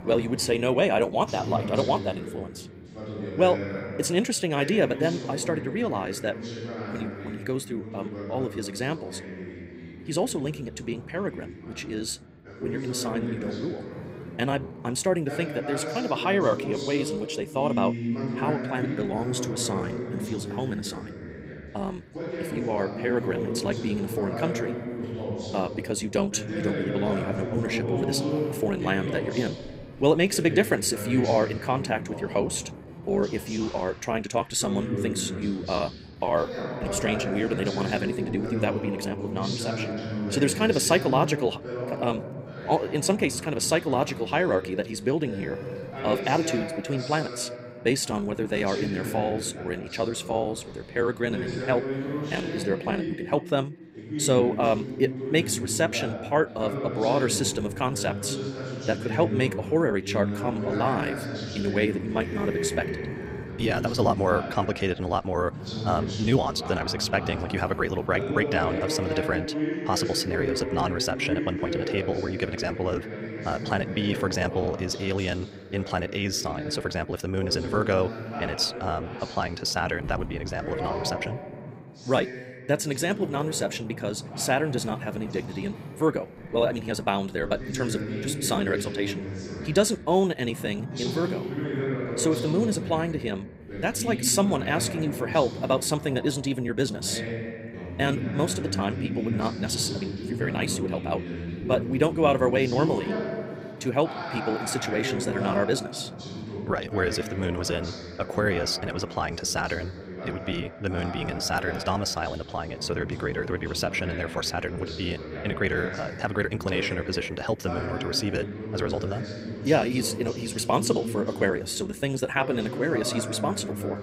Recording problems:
wrong speed, natural pitch; too fast; 1.5 times normal speed
voice in the background; loud; throughout; 6 dB below the speech
wind noise on the microphone; occasional gusts; 20 dB below the speech

